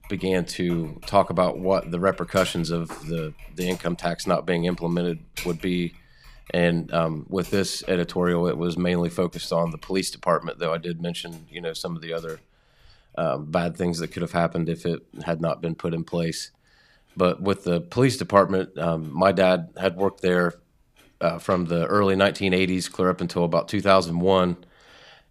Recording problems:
household noises; faint; throughout; 20 dB below the speech

